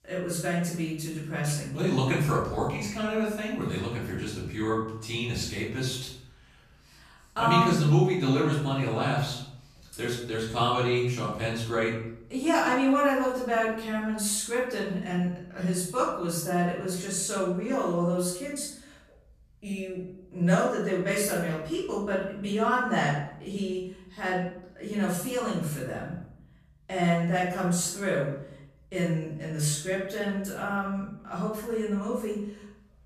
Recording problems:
off-mic speech; far
room echo; noticeable; dies away in 0.6 s

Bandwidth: 14.5 kHz